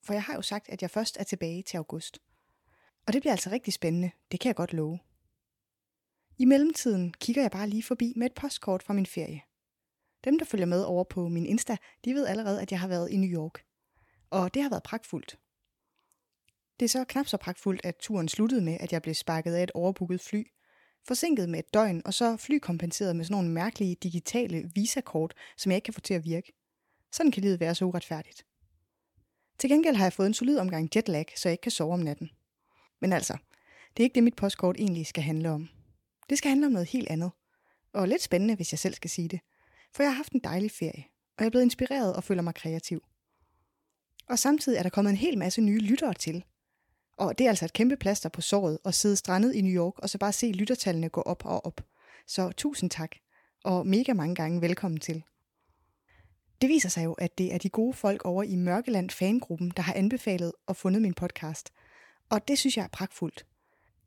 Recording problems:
none

